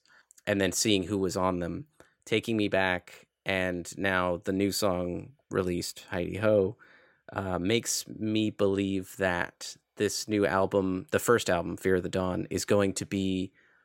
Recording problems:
none

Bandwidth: 16 kHz